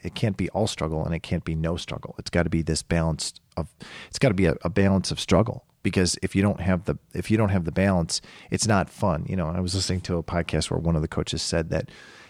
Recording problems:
none

